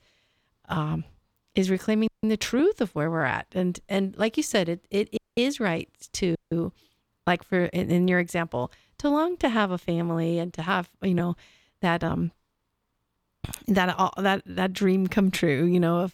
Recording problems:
audio cutting out; at 2 s, at 5 s and at 6.5 s

